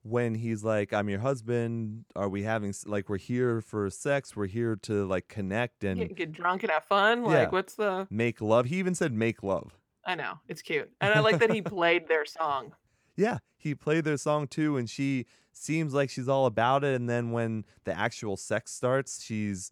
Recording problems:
none

